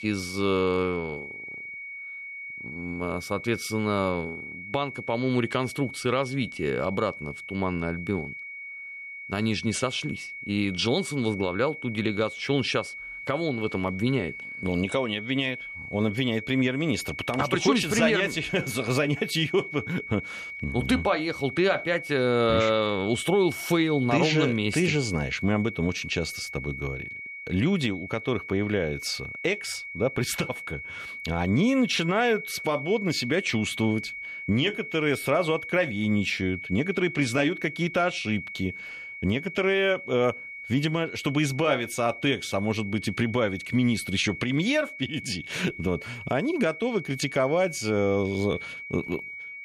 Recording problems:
high-pitched whine; loud; throughout; 2 kHz, 10 dB below the speech

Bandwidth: 14 kHz